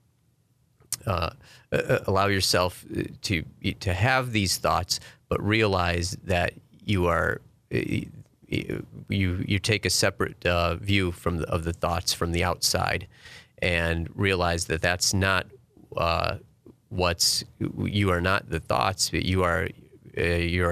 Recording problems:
abrupt cut into speech; at the end

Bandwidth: 14.5 kHz